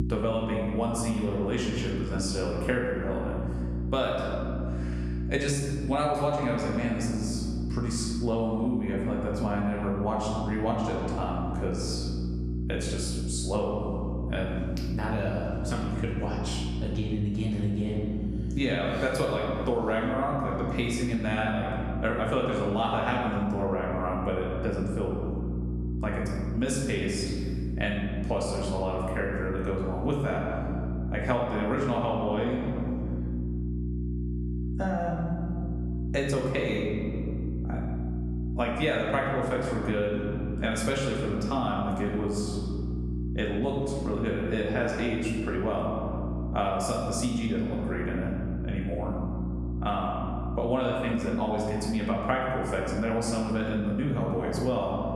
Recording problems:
off-mic speech; far
room echo; noticeable; dies away in 1.4 s
squashed, flat; somewhat
electrical hum; noticeable; throughout; 60 Hz, 15 dB below the speech

